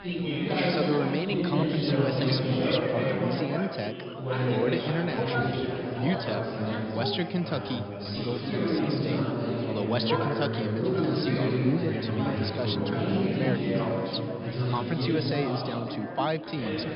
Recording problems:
high frequencies cut off; noticeable; nothing above 5.5 kHz
chatter from many people; very loud; throughout; 3 dB above the speech

